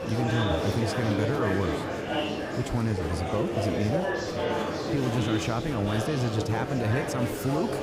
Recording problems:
murmuring crowd; loud; throughout; 1 dB below the speech

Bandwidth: 15.5 kHz